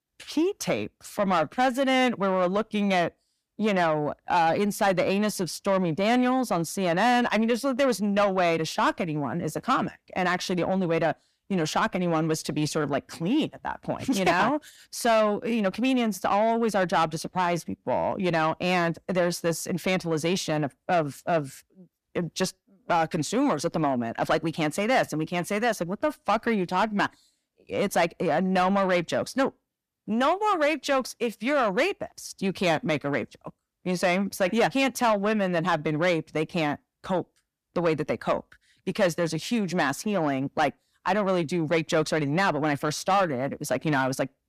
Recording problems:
distortion; slight; 10 dB below the speech

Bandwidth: 14.5 kHz